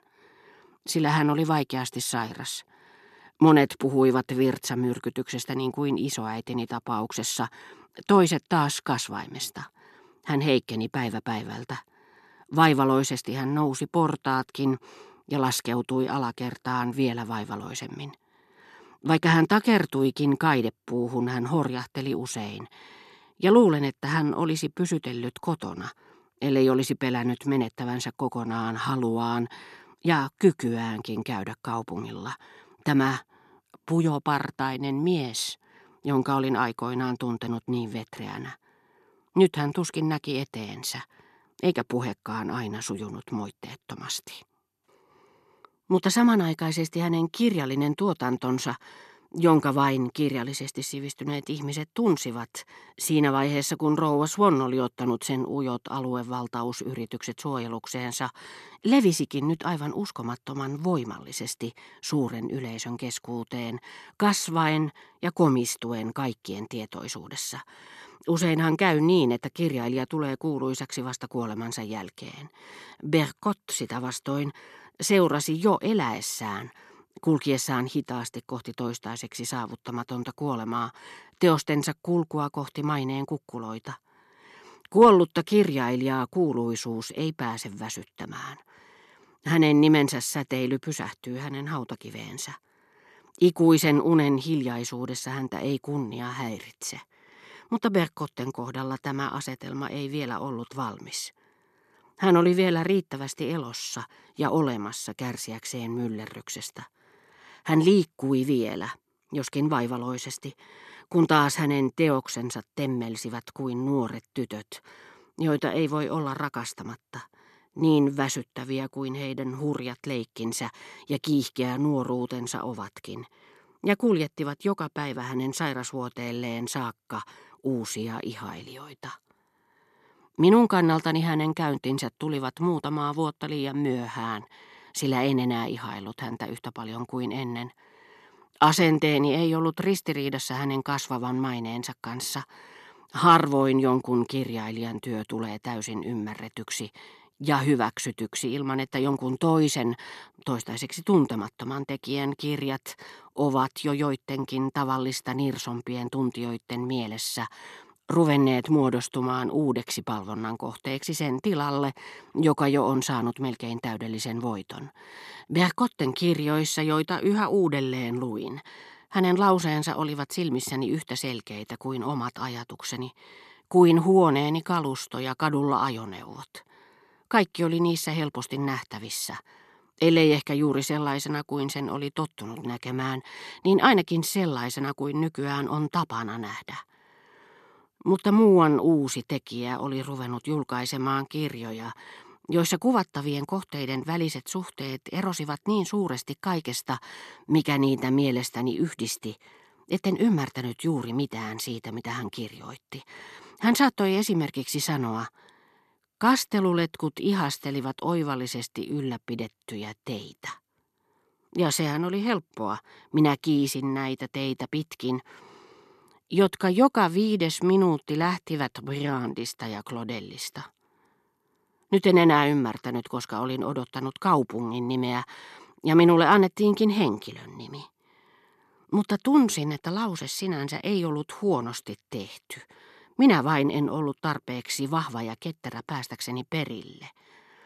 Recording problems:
none

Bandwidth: 13.5 kHz